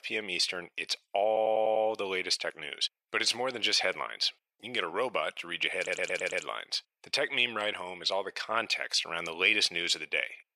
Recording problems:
thin; very; fading below 650 Hz
audio stuttering; at 1.5 s and at 6 s

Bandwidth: 14.5 kHz